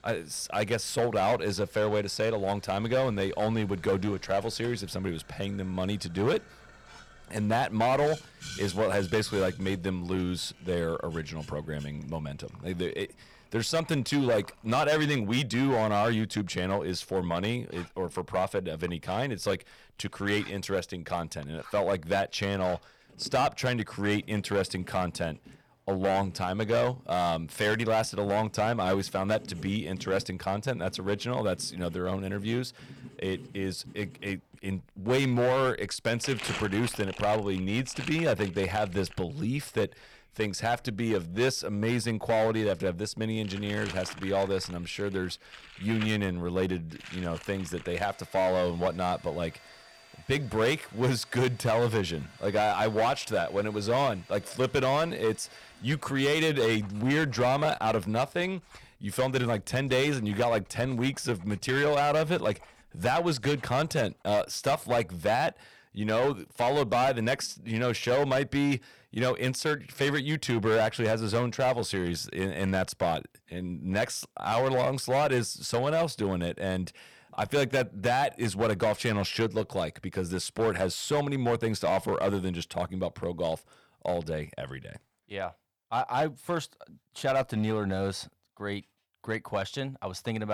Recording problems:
distortion; slight; 7% of the sound clipped
household noises; noticeable; until 1:04; 20 dB below the speech
abrupt cut into speech; at the end

